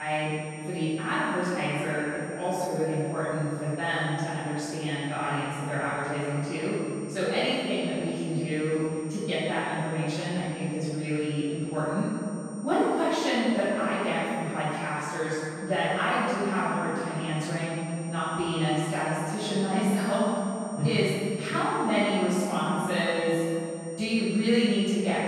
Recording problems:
room echo; strong; dies away in 2.6 s
off-mic speech; far
high-pitched whine; noticeable; throughout; 8.5 kHz, 20 dB below the speech
abrupt cut into speech; at the start

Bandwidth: 15.5 kHz